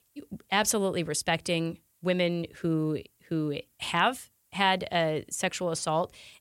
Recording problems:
none

